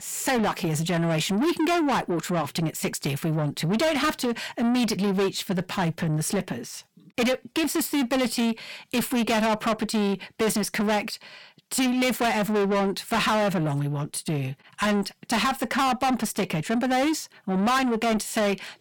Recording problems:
distortion; heavy; 6 dB below the speech

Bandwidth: 17.5 kHz